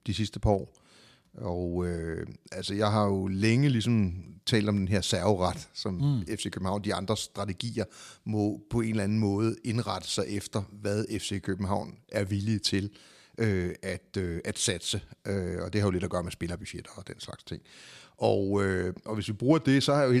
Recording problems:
abrupt cut into speech; at the end

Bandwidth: 14.5 kHz